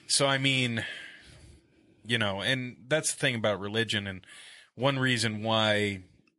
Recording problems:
garbled, watery; slightly; nothing above 11 kHz

